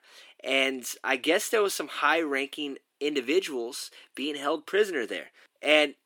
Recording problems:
thin; very slightly; fading below 300 Hz

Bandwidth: 18 kHz